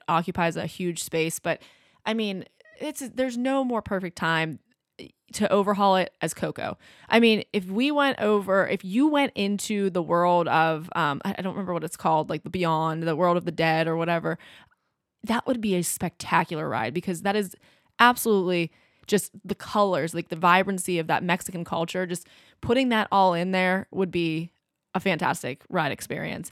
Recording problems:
none

